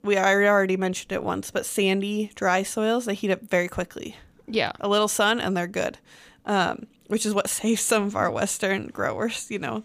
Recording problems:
none

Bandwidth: 15 kHz